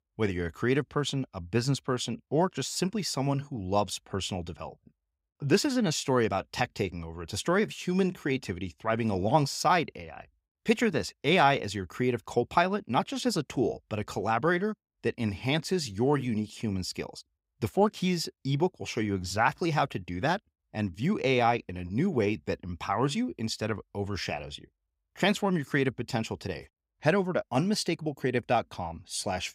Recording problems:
none

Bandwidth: 15.5 kHz